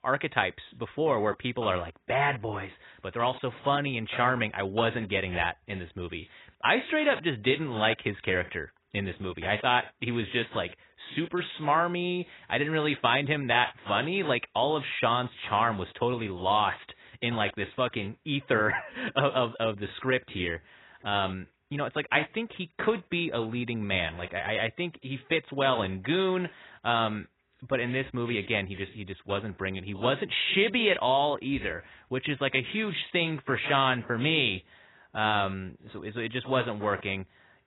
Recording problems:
garbled, watery; badly; nothing above 4 kHz

